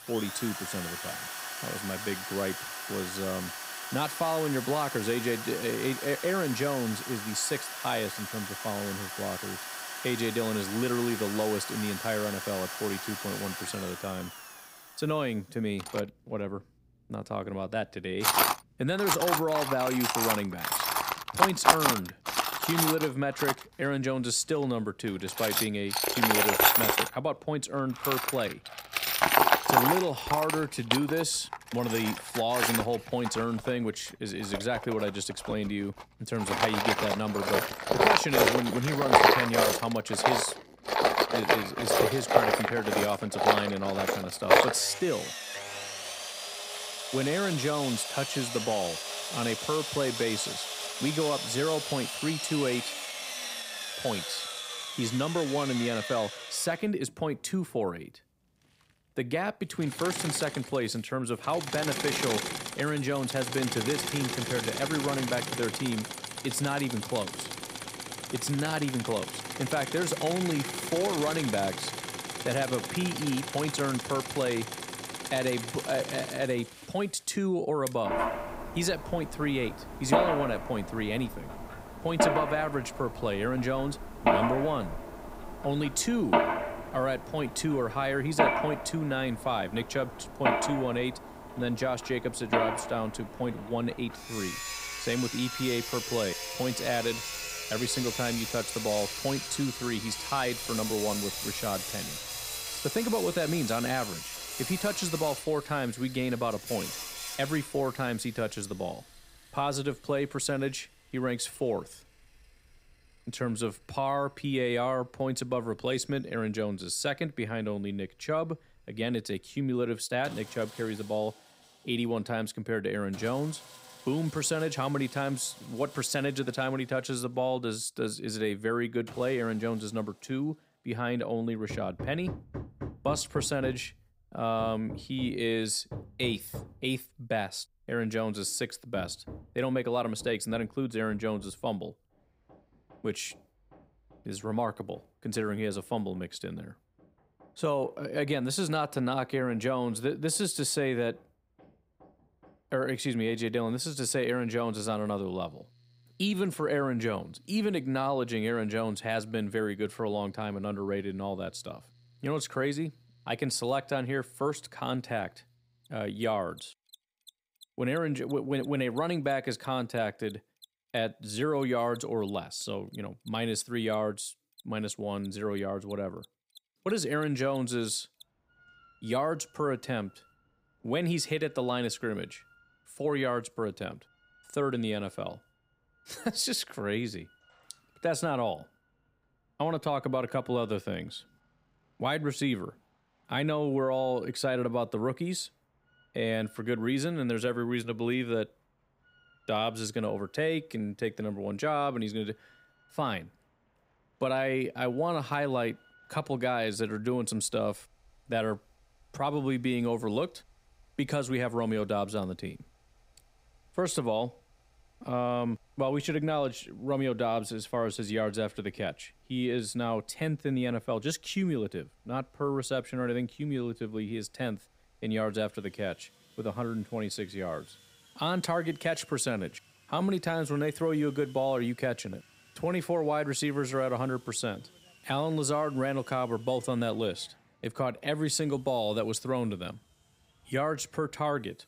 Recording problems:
machinery noise; very loud; throughout; as loud as the speech

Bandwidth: 15.5 kHz